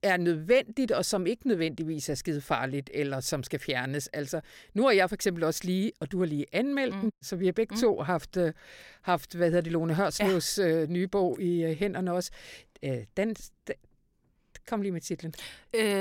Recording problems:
abrupt cut into speech; at the end

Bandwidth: 16.5 kHz